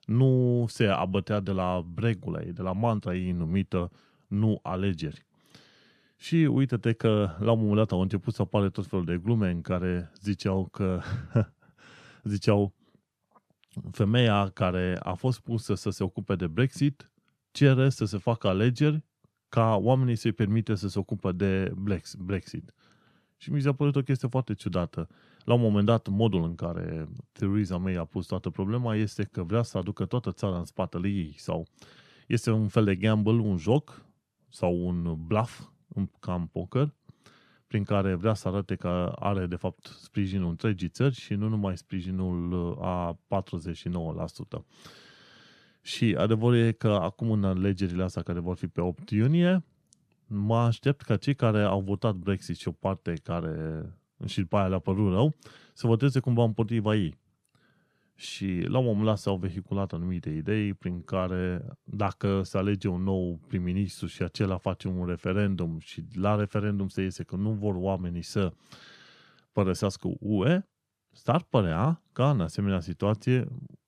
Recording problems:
none

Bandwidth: 14 kHz